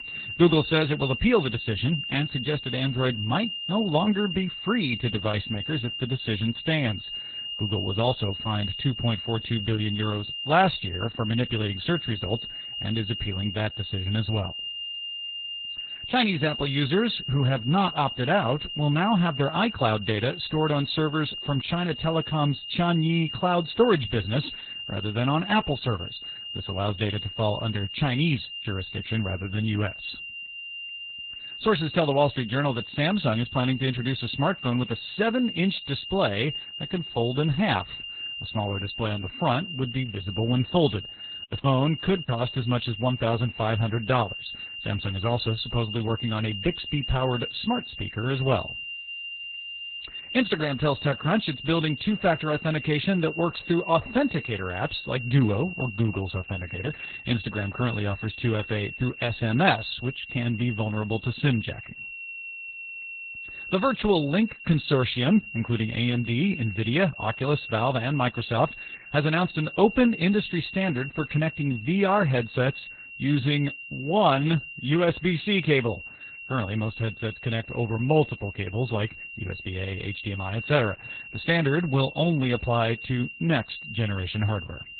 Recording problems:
garbled, watery; badly; nothing above 4 kHz
high-pitched whine; loud; throughout; 3 kHz, 8 dB below the speech
choppy; very; at 42 s; 7% of the speech affected

